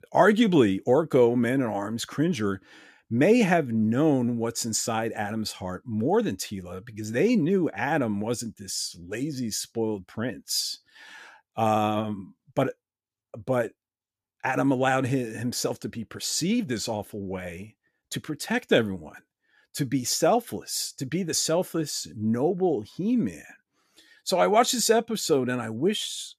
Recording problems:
none

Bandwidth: 14.5 kHz